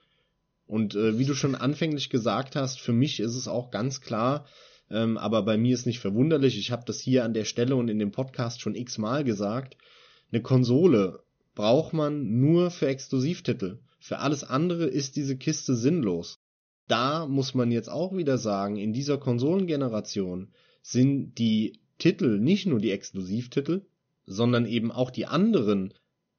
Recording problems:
high frequencies cut off; noticeable; nothing above 6.5 kHz

